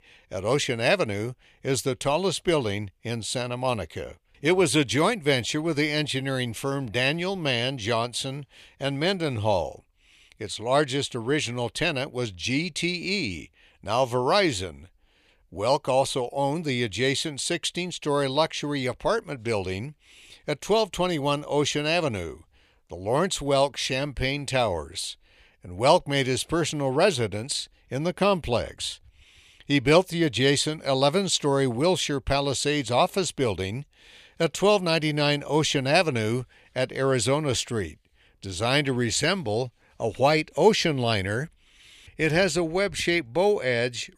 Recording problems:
none

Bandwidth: 15 kHz